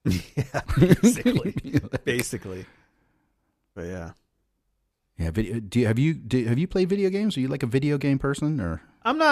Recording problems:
abrupt cut into speech; at the end

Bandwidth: 14.5 kHz